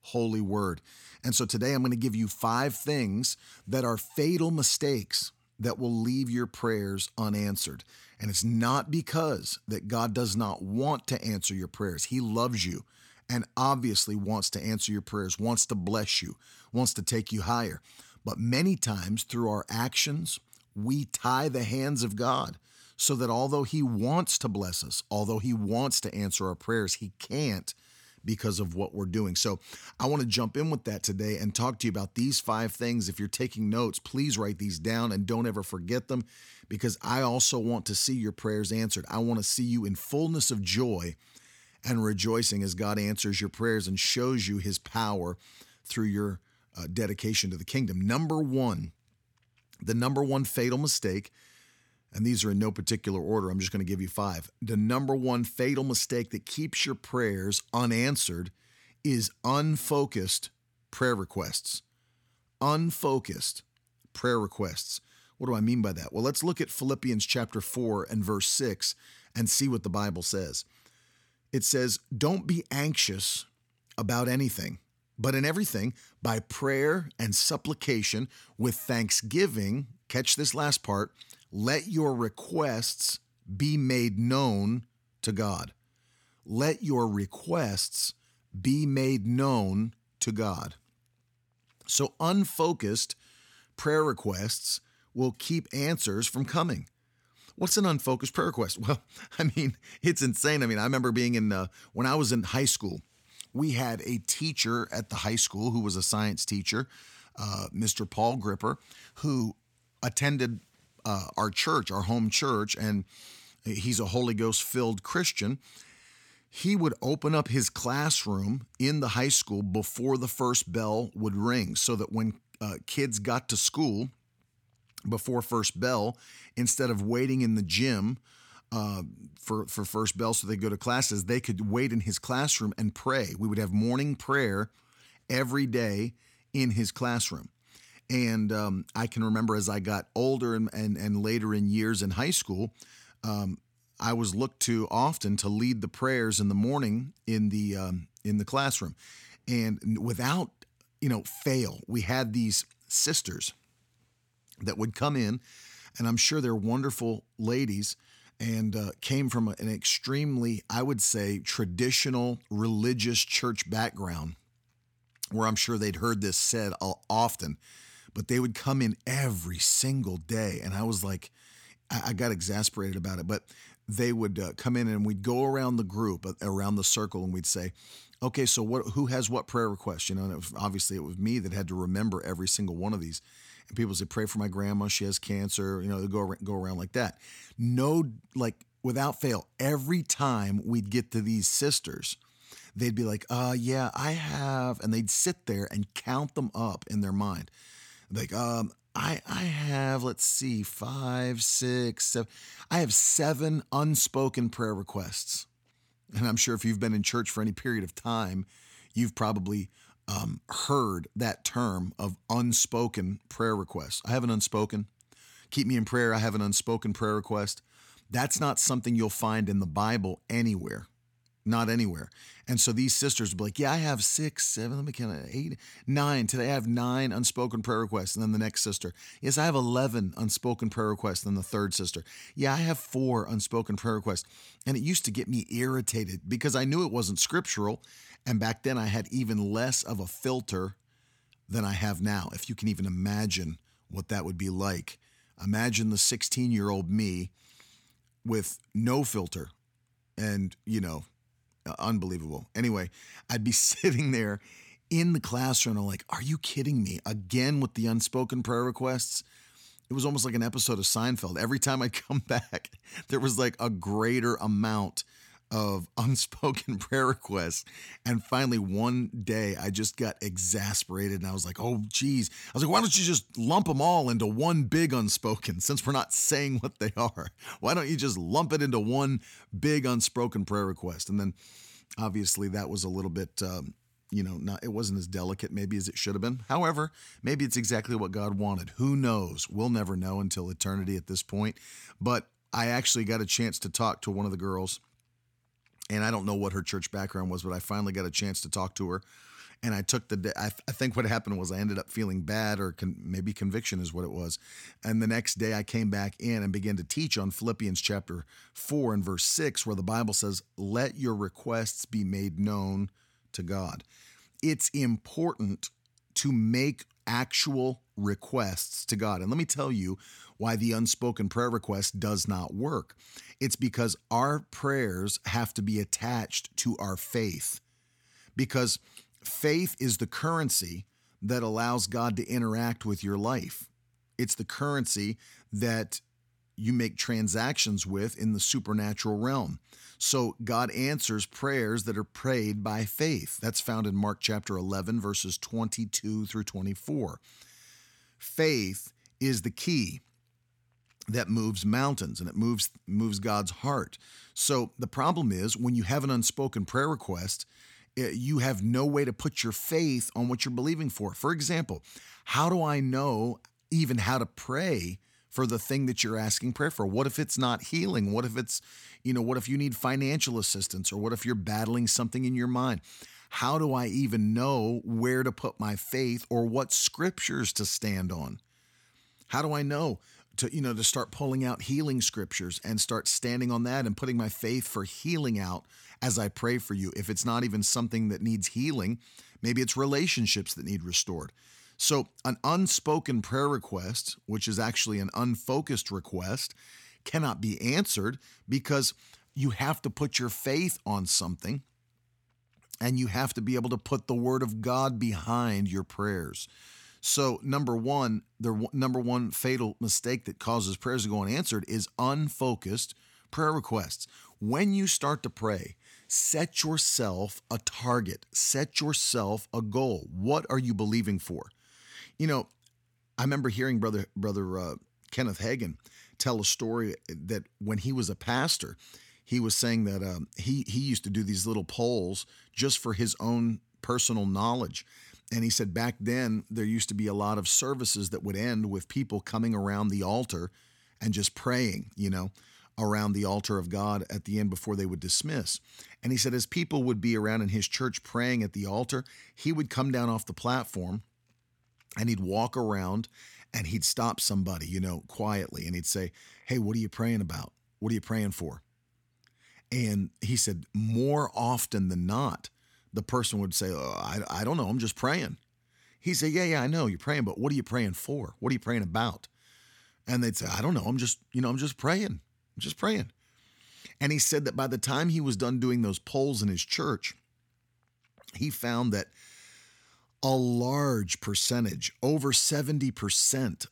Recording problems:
none

